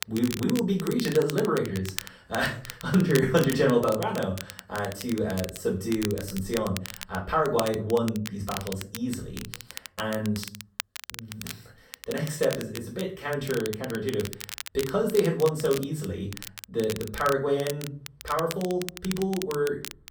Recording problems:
off-mic speech; far
room echo; slight; dies away in 0.4 s
crackle, like an old record; noticeable; 10 dB below the speech

